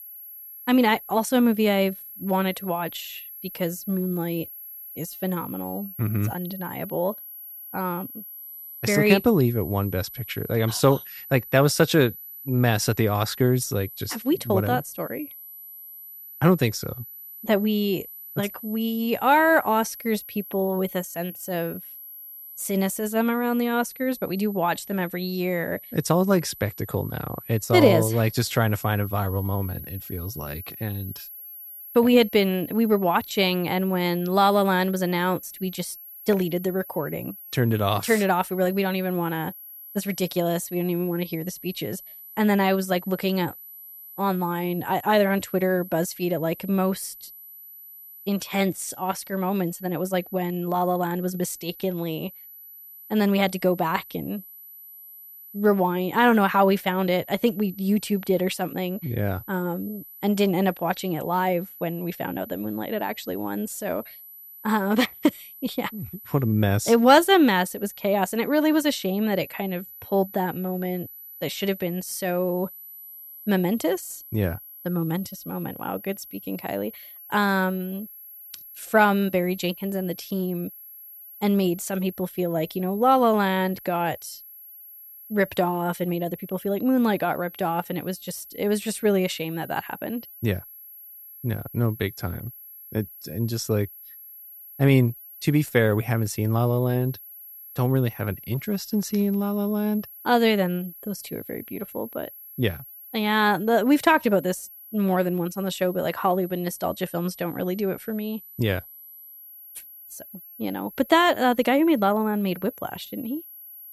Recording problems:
high-pitched whine; noticeable; throughout; 11.5 kHz, 15 dB below the speech

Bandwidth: 14.5 kHz